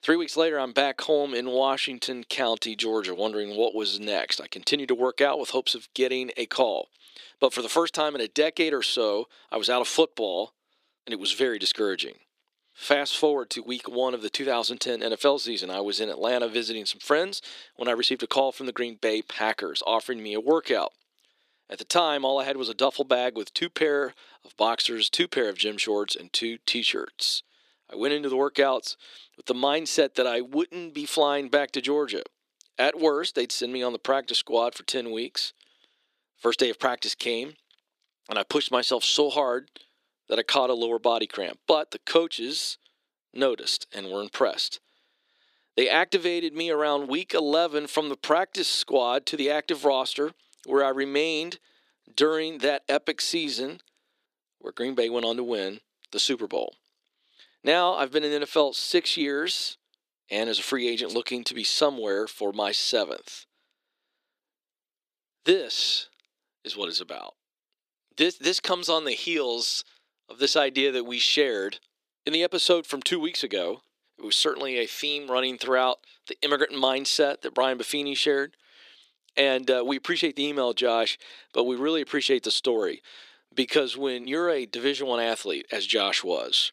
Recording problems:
thin; somewhat; fading below 300 Hz

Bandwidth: 14.5 kHz